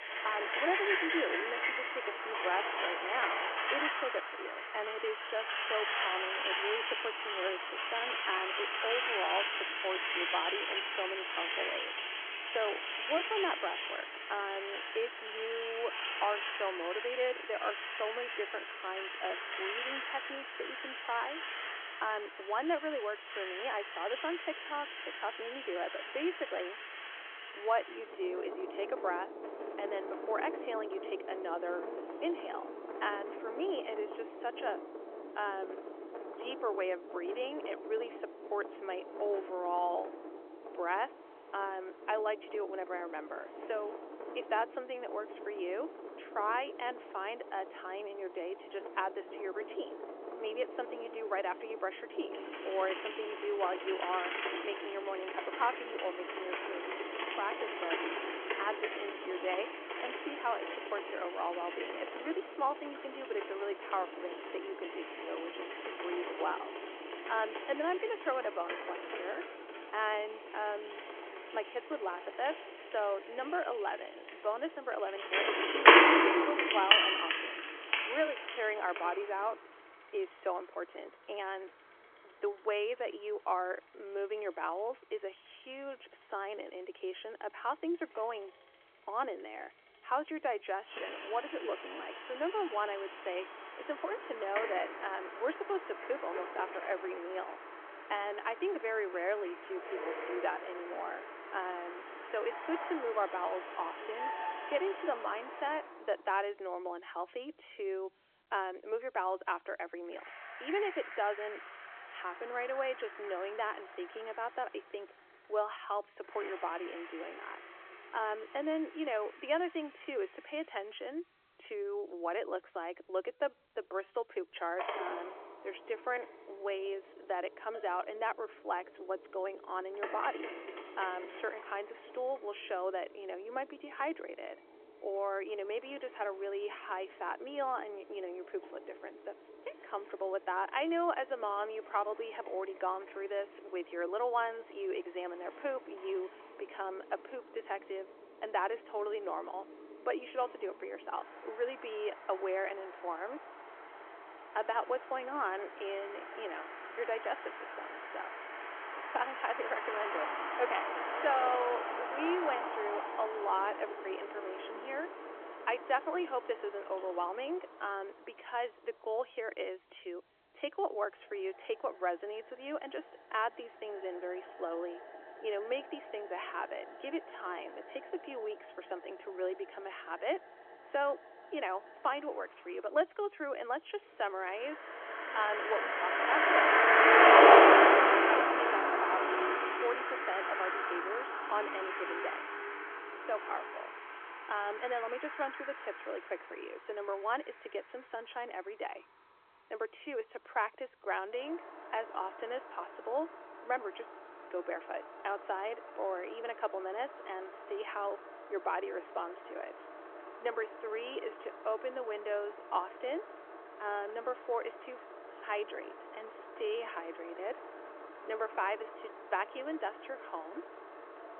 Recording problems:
phone-call audio
traffic noise; very loud; throughout; 5 dB above the speech

